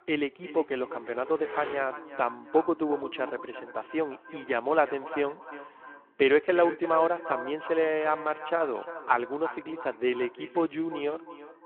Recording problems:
echo of what is said; noticeable; throughout; 350 ms later, 15 dB below the speech
phone-call audio
traffic noise; noticeable; throughout; 15 dB below the speech

